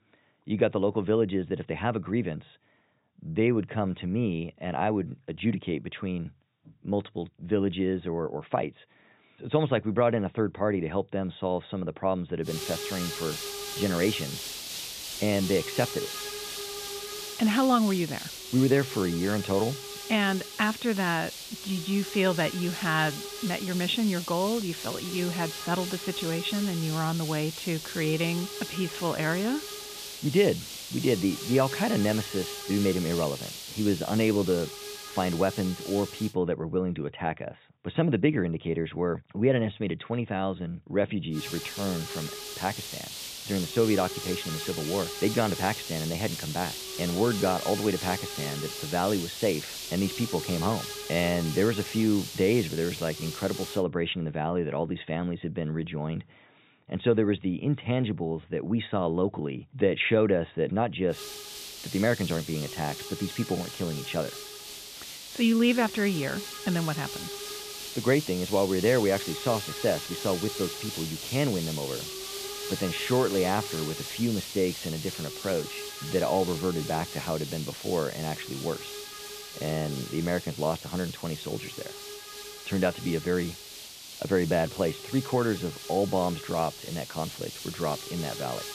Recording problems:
high frequencies cut off; severe; nothing above 4 kHz
hiss; loud; from 12 to 36 s, from 41 to 54 s and from 1:01 on; 7 dB below the speech

